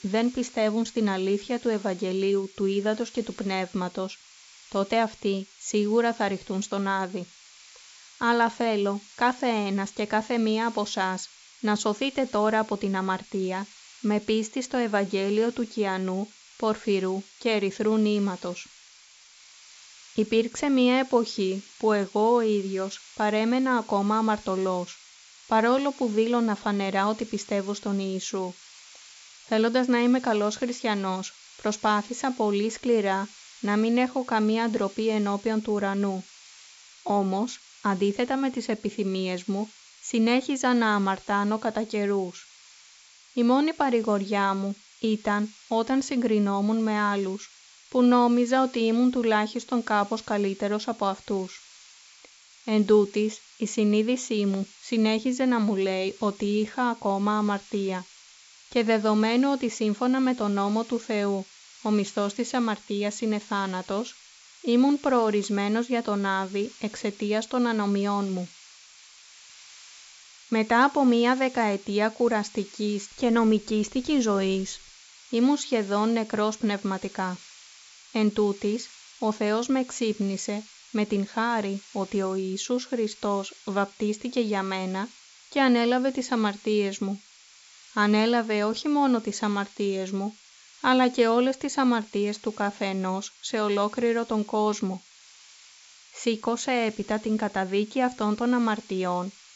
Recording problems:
high frequencies cut off; noticeable; nothing above 8 kHz
hiss; faint; throughout; 20 dB below the speech

